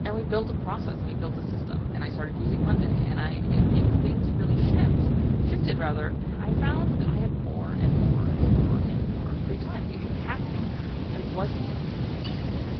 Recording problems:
high frequencies cut off; noticeable; nothing above 5.5 kHz
garbled, watery; slightly
wind noise on the microphone; heavy; 3 dB above the speech
train or aircraft noise; loud; throughout; 2 dB below the speech
crowd noise; noticeable; throughout; 15 dB below the speech
clattering dishes; noticeable; at 12 s; peak 5 dB below the speech

